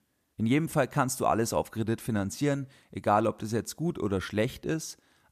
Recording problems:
none

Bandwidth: 14.5 kHz